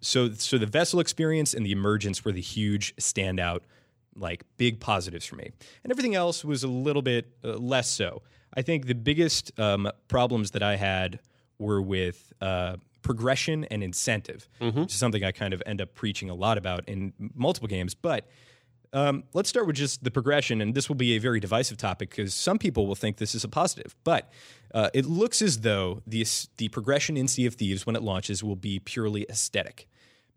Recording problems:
none

